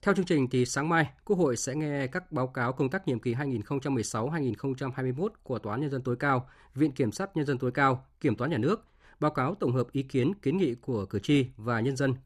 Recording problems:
none

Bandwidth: 14 kHz